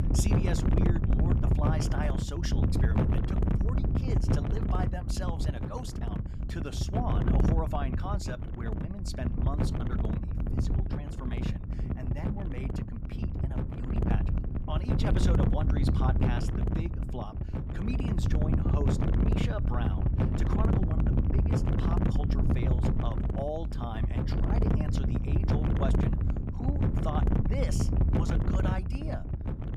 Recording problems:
wind noise on the microphone; heavy; 2 dB above the speech

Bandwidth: 15.5 kHz